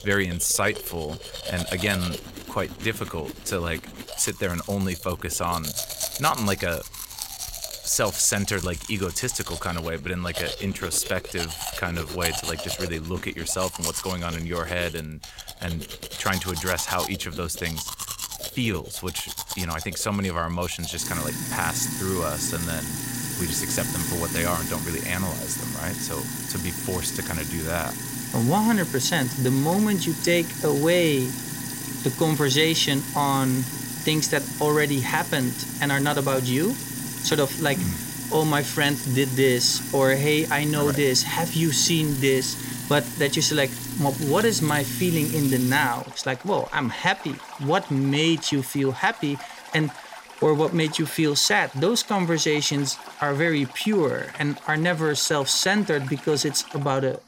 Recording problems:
household noises; loud; throughout; 7 dB below the speech

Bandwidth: 16 kHz